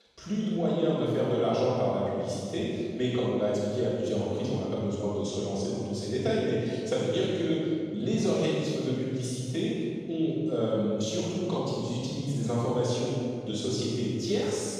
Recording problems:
room echo; strong; dies away in 2 s
off-mic speech; far

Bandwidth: 13.5 kHz